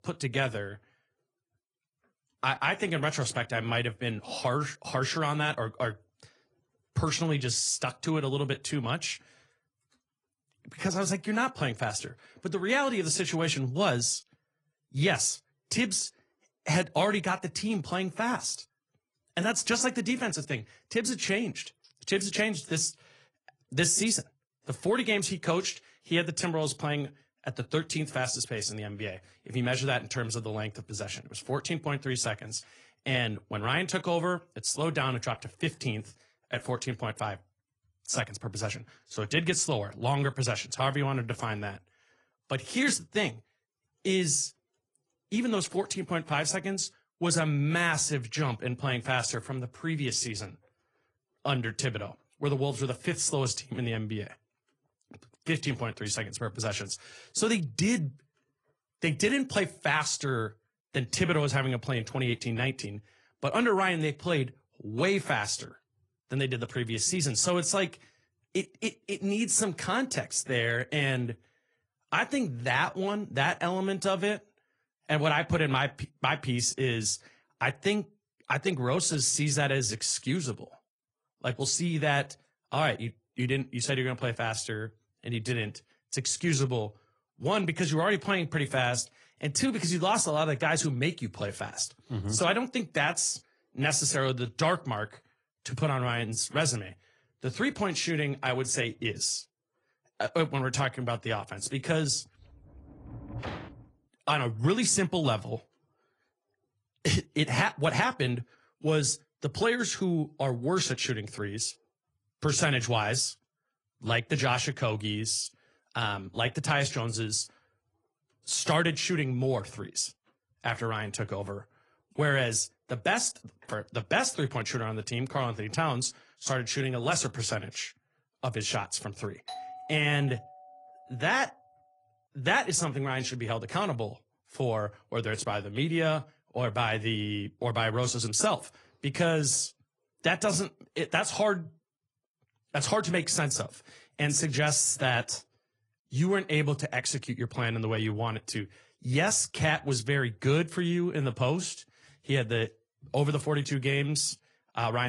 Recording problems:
garbled, watery; slightly; nothing above 10 kHz
door banging; noticeable; from 1:42 to 1:44; peak 9 dB below the speech
doorbell; faint; from 2:09 to 2:11; peak 10 dB below the speech
abrupt cut into speech; at the end

